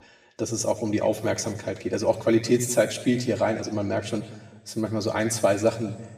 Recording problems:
room echo; slight; dies away in 1 s
off-mic speech; somewhat distant

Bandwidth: 14.5 kHz